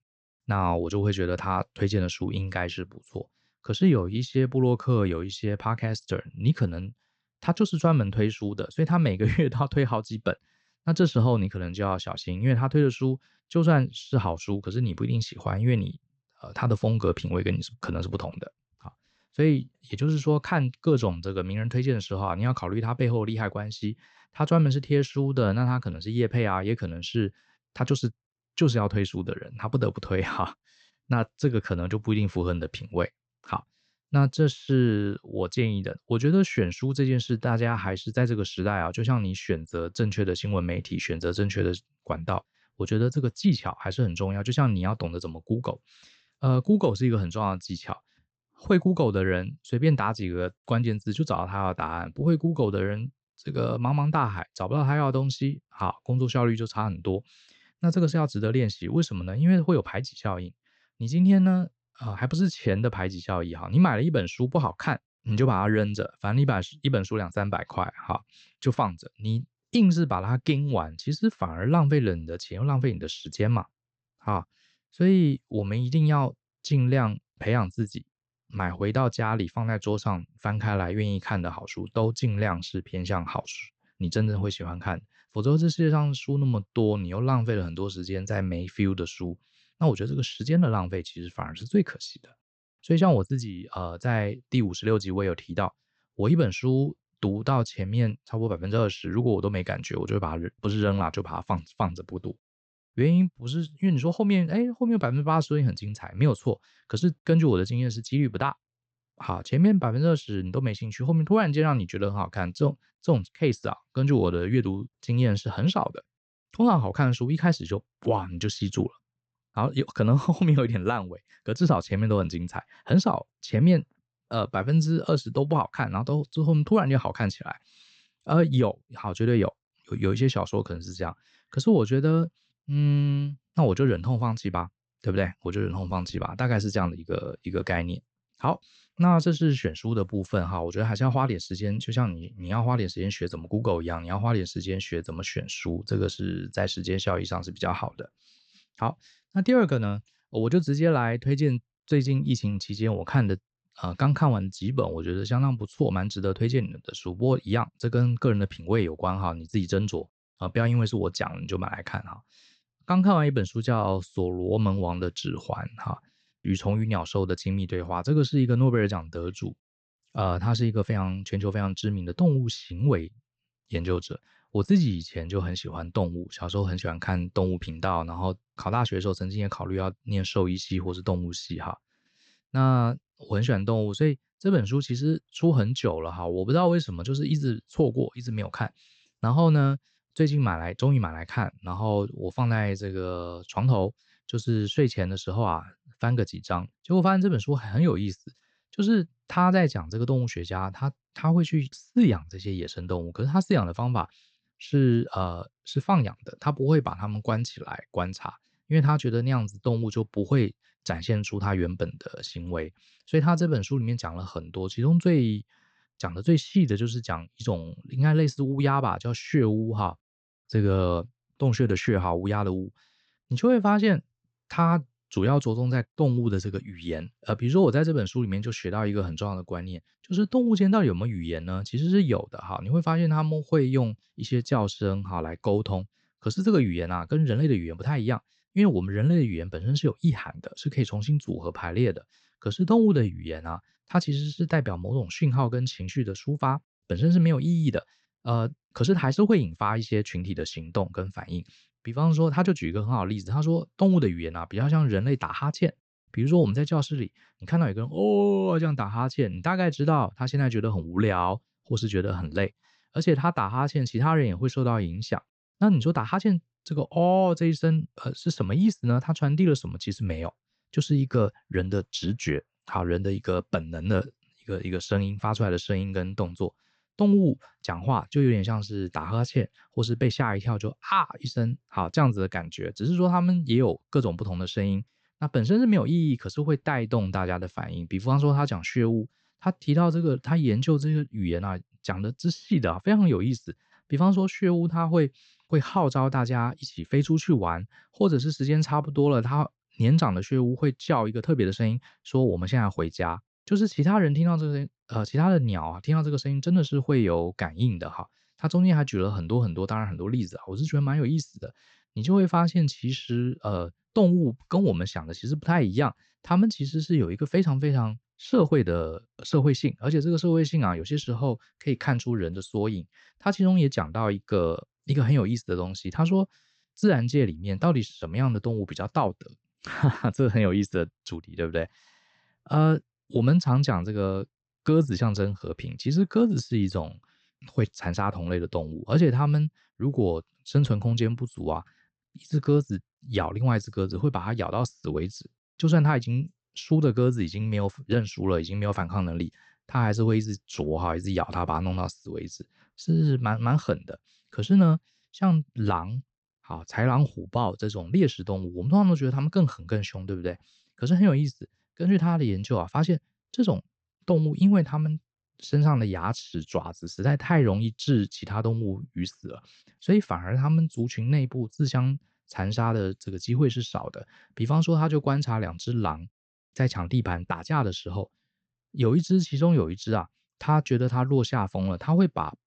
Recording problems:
high frequencies cut off; noticeable; nothing above 8 kHz

